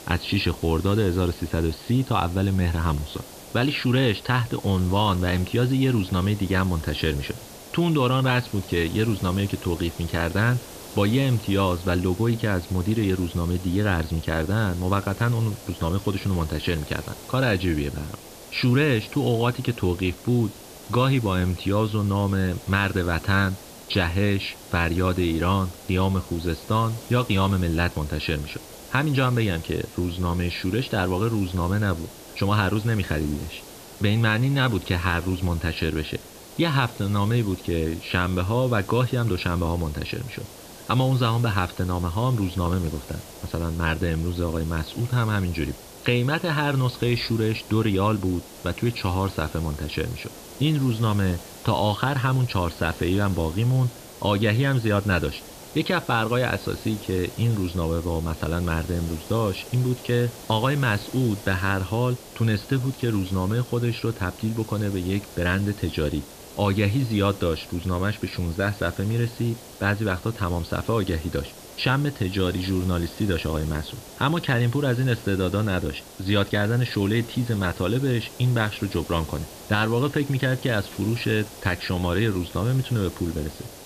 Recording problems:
high frequencies cut off; severe; nothing above 5 kHz
hiss; noticeable; throughout; 15 dB below the speech

